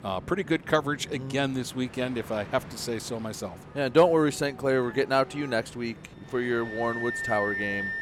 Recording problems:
background music; loud; throughout; 6 dB below the speech
train or aircraft noise; noticeable; throughout; 20 dB below the speech

